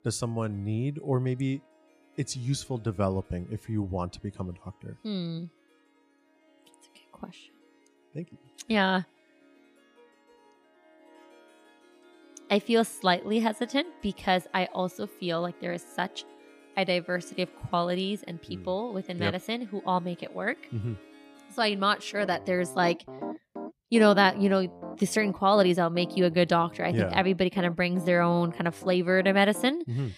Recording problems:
background music; noticeable; throughout; 20 dB below the speech

